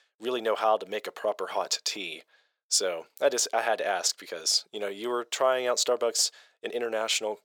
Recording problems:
thin; very; fading below 500 Hz

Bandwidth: 18.5 kHz